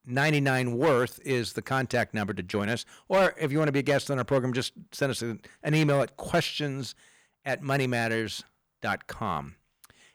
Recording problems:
distortion; slight; 4% of the sound clipped

